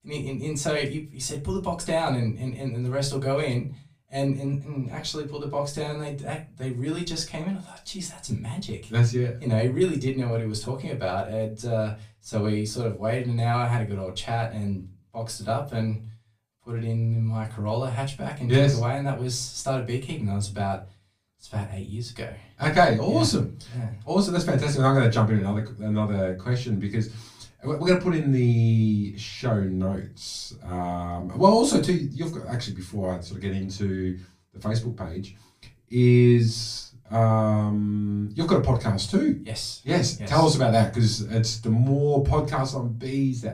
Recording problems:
off-mic speech; far
room echo; very slight; dies away in 0.3 s

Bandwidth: 15 kHz